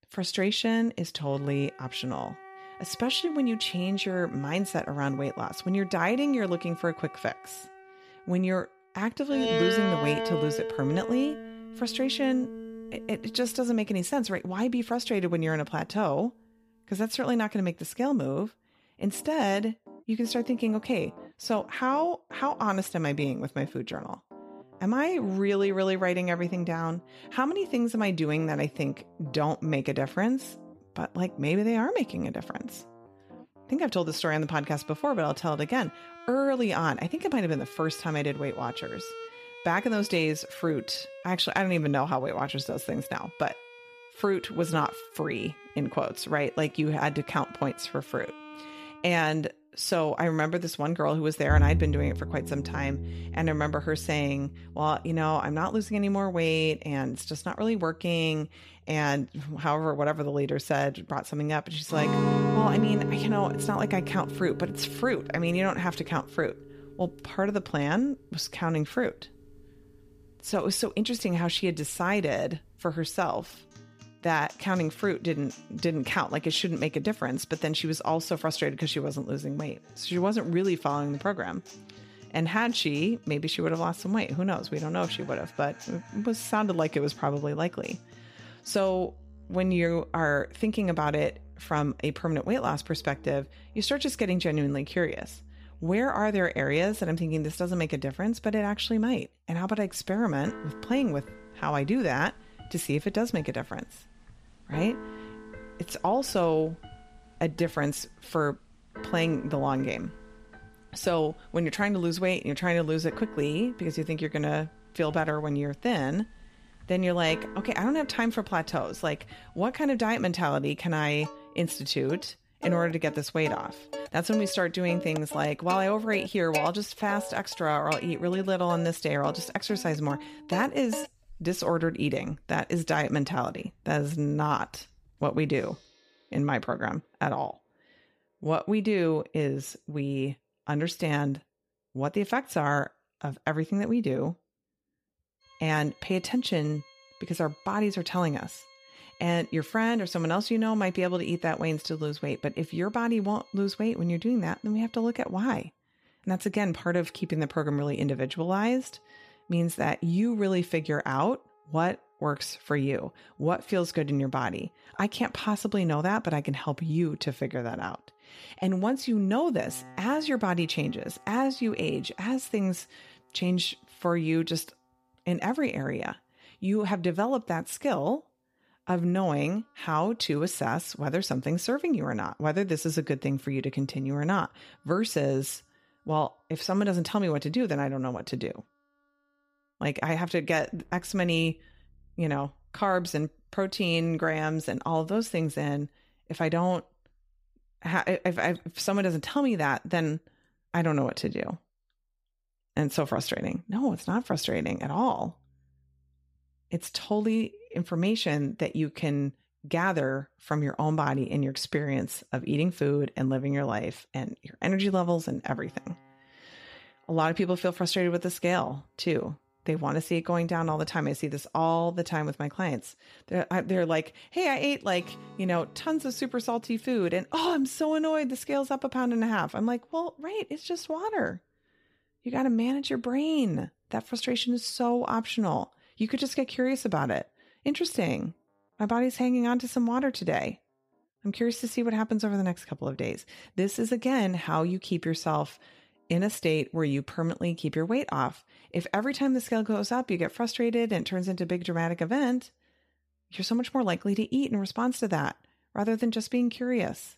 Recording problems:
background music; noticeable; throughout; 10 dB below the speech

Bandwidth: 15 kHz